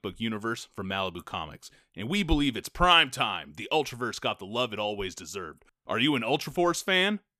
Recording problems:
none

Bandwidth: 14.5 kHz